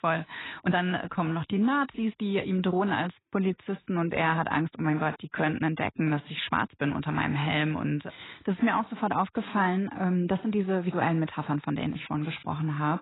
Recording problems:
garbled, watery; badly; nothing above 4 kHz
uneven, jittery; strongly; from 0.5 to 12 s

